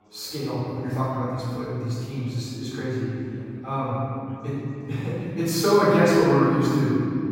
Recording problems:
room echo; strong; dies away in 2.8 s
off-mic speech; far
background chatter; faint; throughout; 4 voices, 30 dB below the speech

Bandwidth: 16 kHz